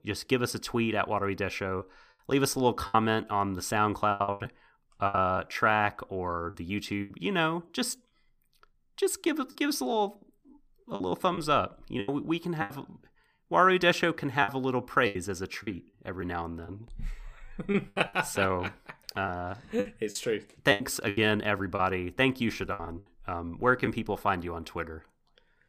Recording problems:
choppy; very; 8% of the speech affected

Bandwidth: 15 kHz